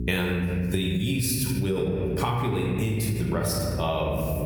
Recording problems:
room echo; noticeable; dies away in 1.7 s
off-mic speech; somewhat distant
squashed, flat; somewhat
electrical hum; faint; throughout; 60 Hz, 20 dB below the speech

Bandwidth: 18.5 kHz